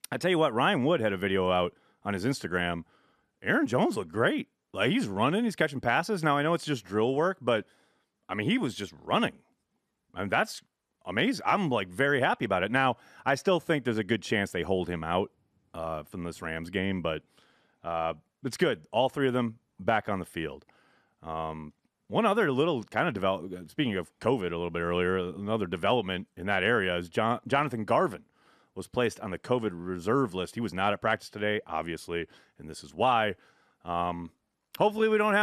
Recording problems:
abrupt cut into speech; at the end

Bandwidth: 14 kHz